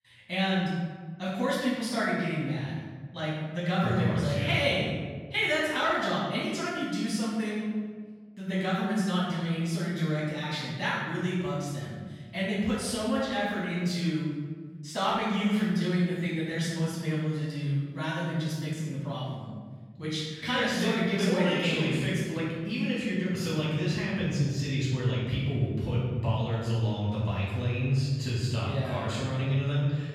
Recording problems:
room echo; strong; dies away in 1.6 s
off-mic speech; far

